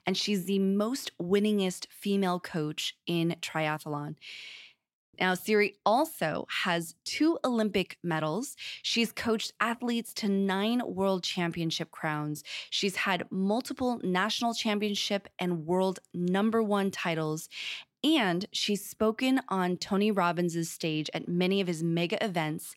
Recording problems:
none

